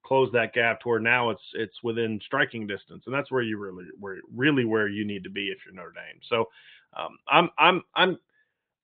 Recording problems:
high frequencies cut off; severe; nothing above 4 kHz

